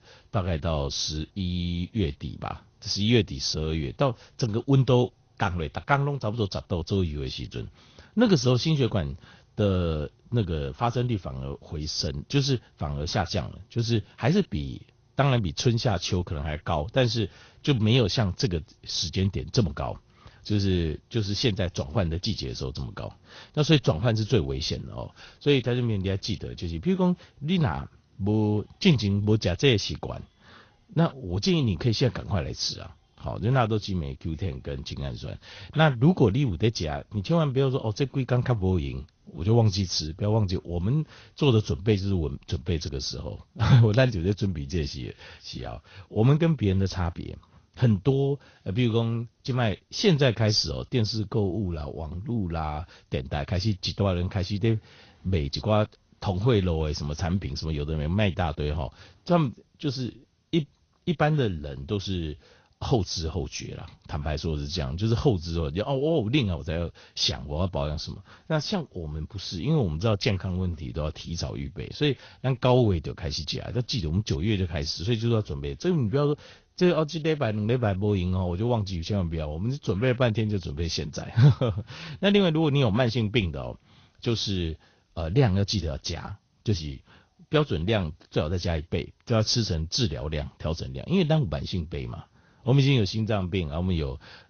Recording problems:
garbled, watery; slightly; nothing above 6.5 kHz

